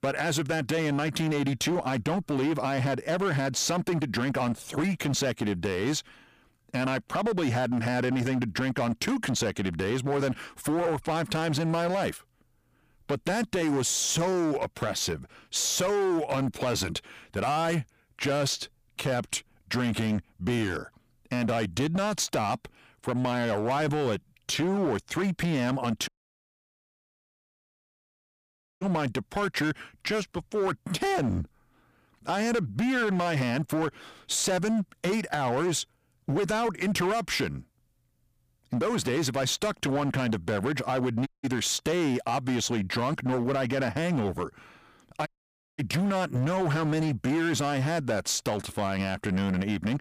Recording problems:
distortion; slight; 17% of the sound clipped
audio cutting out; at 26 s for 2.5 s, at 41 s and at 45 s for 0.5 s

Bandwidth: 15 kHz